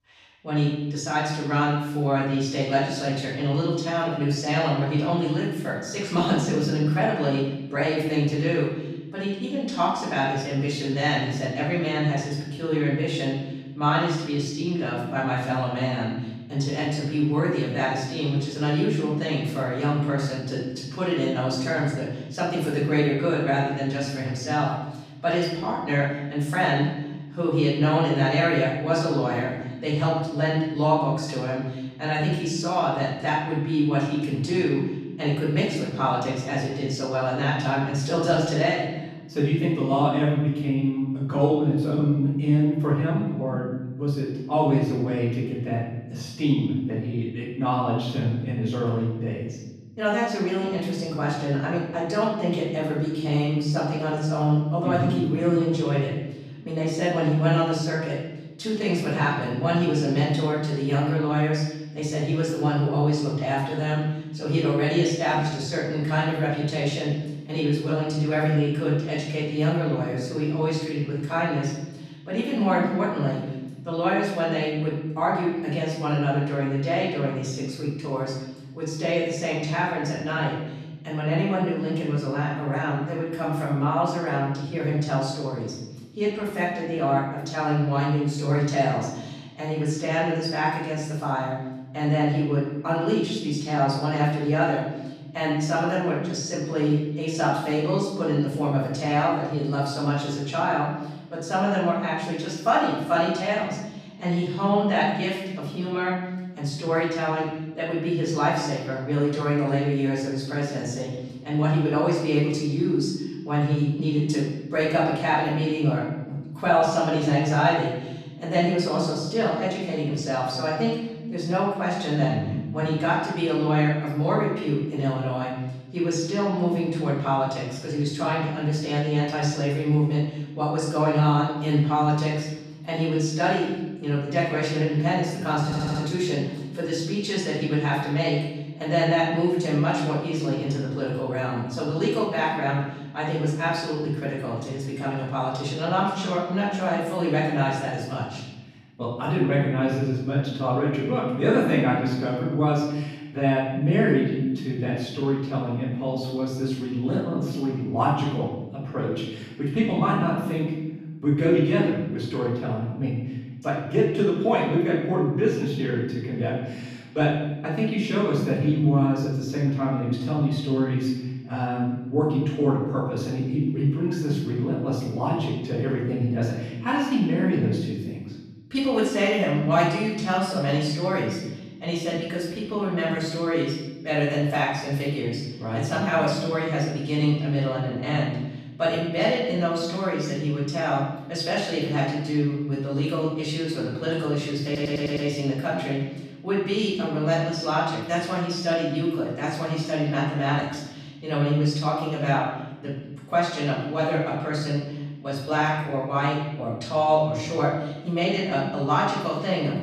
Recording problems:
off-mic speech; far
room echo; noticeable; dies away in 1.2 s
audio stuttering; at 2:16 and at 3:15

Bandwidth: 15 kHz